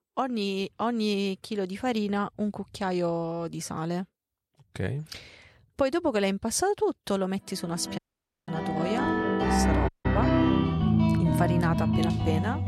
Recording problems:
background music; very loud; from 8.5 s on; 4 dB above the speech
audio cutting out; at 8 s and at 10 s

